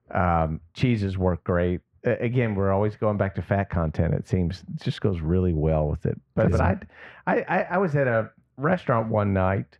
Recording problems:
muffled; very; fading above 1.5 kHz

